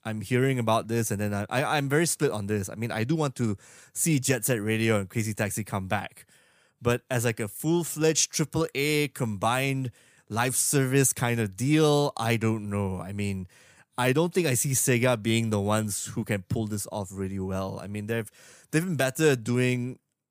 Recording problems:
none

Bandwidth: 15 kHz